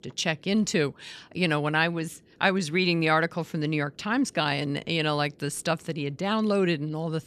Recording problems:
none

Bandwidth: 14.5 kHz